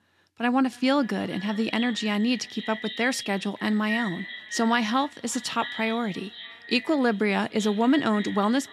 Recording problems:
echo of what is said; strong; throughout; 290 ms later, 10 dB below the speech

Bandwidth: 13.5 kHz